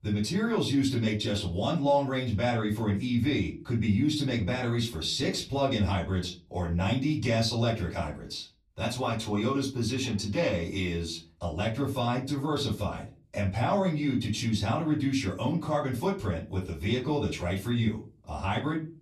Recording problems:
off-mic speech; far
room echo; very slight; dies away in 0.3 s

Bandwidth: 13.5 kHz